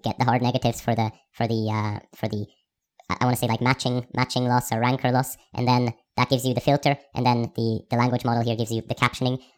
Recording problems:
wrong speed and pitch; too fast and too high; 1.5 times normal speed

